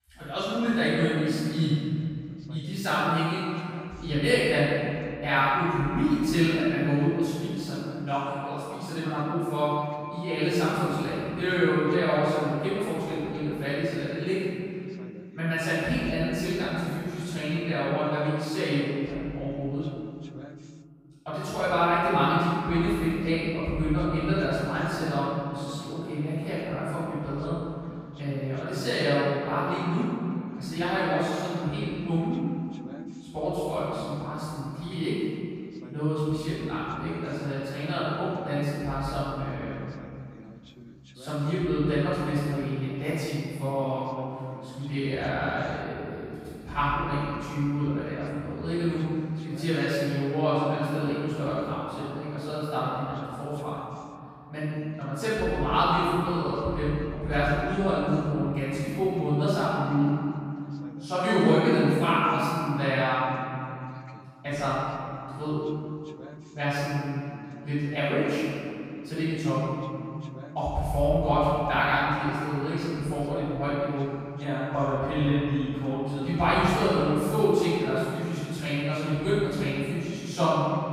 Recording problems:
room echo; strong; dies away in 2.6 s
off-mic speech; far
voice in the background; faint; throughout; 25 dB below the speech

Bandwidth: 15.5 kHz